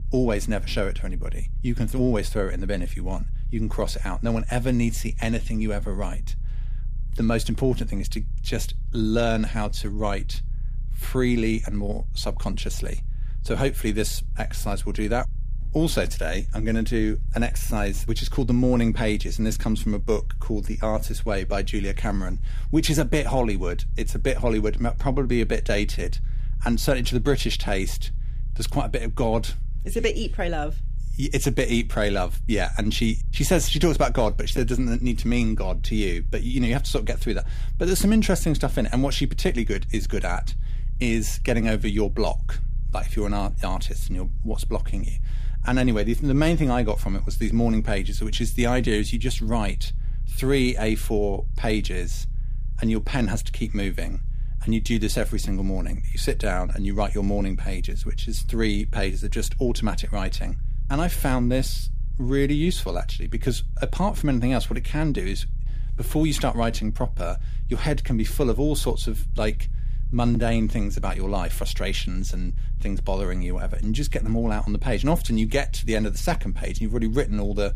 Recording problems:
low rumble; faint; throughout; 25 dB below the speech

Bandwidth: 15 kHz